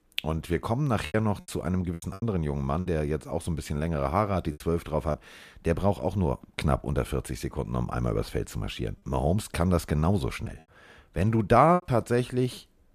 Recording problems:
choppy; occasionally; 5% of the speech affected

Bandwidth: 14.5 kHz